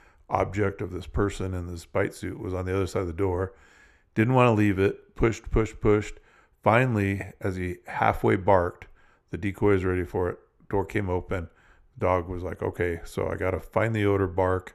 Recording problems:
muffled; slightly; fading above 3 kHz

